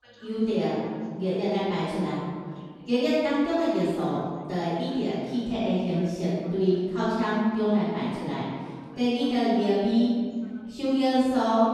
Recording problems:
room echo; strong; dies away in 1.6 s
off-mic speech; far
background chatter; faint; throughout; 2 voices, 30 dB below the speech

